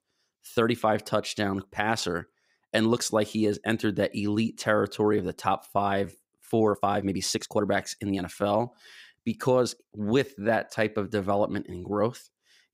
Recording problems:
uneven, jittery; strongly; from 0.5 to 11 s

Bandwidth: 15.5 kHz